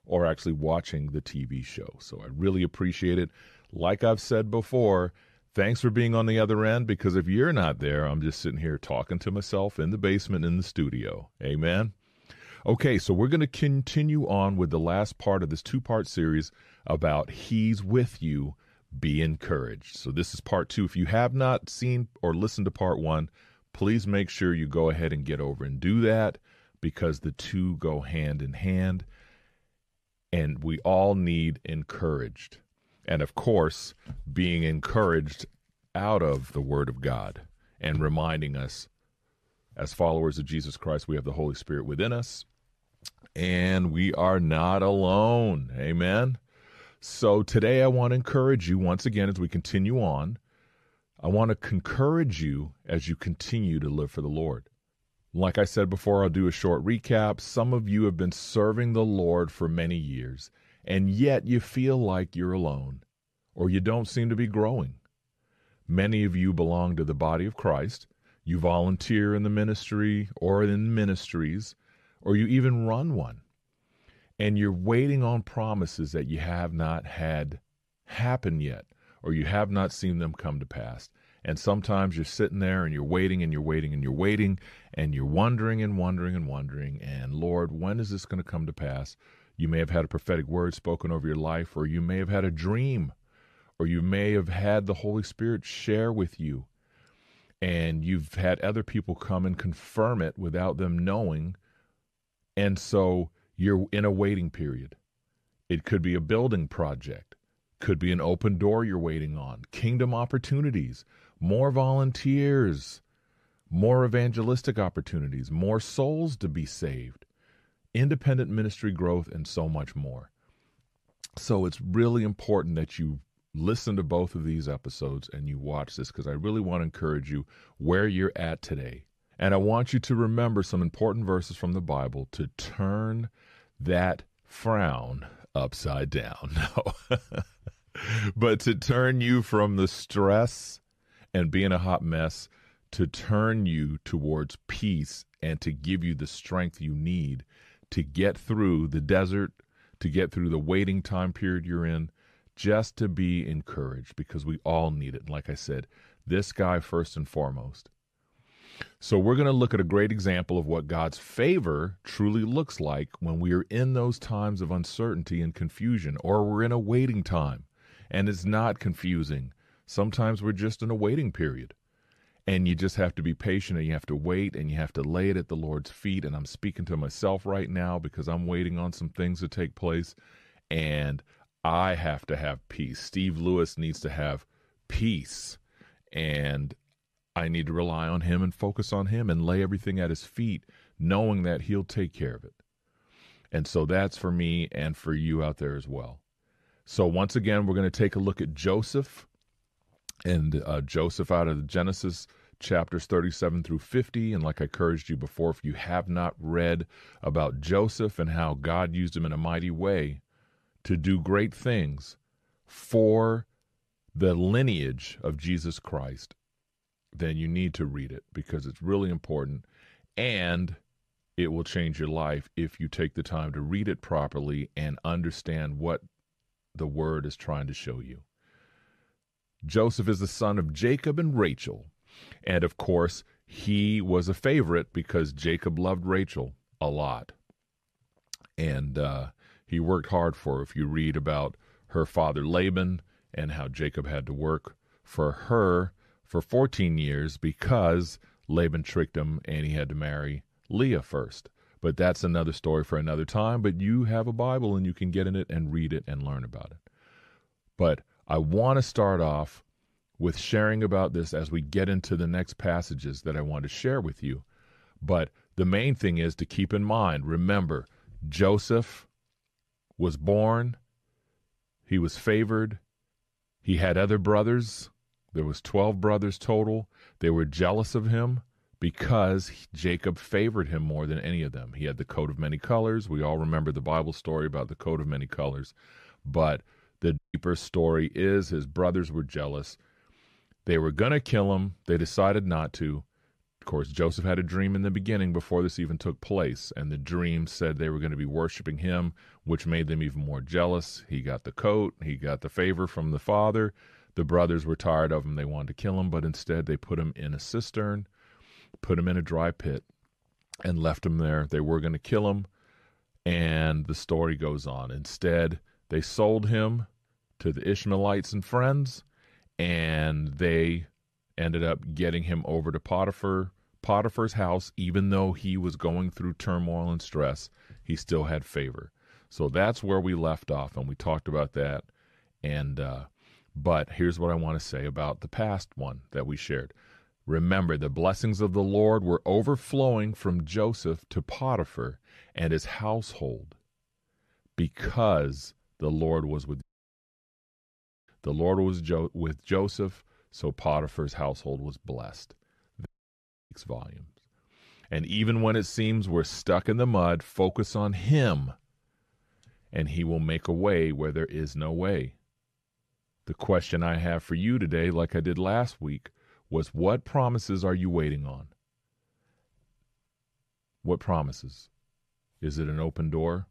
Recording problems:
audio cutting out; at 4:47, at 5:47 for 1.5 s and at 5:53 for 0.5 s

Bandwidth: 14.5 kHz